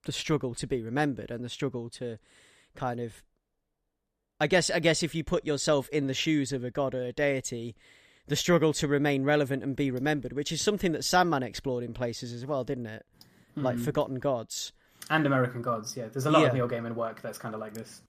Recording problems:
none

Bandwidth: 14.5 kHz